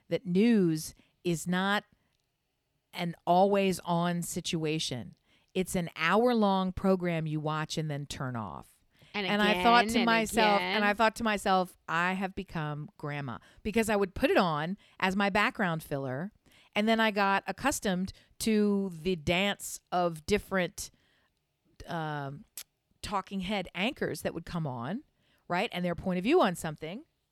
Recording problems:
none

